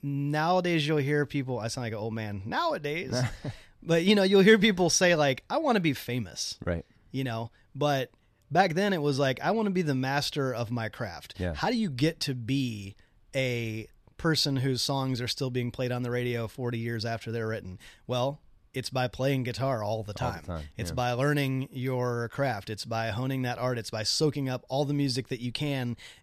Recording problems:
none

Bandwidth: 14 kHz